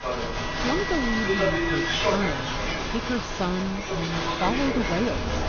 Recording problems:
high frequencies cut off; noticeable; nothing above 6.5 kHz
crowd noise; very loud; throughout; 3 dB above the speech
wind noise on the microphone; occasional gusts; 15 dB below the speech

